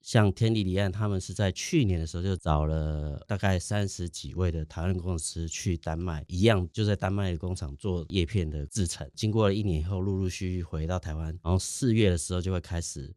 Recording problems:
none

